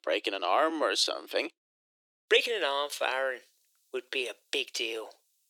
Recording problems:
thin; very; fading below 300 Hz
uneven, jittery; strongly

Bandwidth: 18.5 kHz